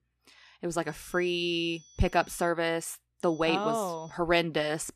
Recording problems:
high-pitched whine; faint; from 1 to 2.5 s and at 3.5 s; 6 kHz, 25 dB below the speech

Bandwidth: 14.5 kHz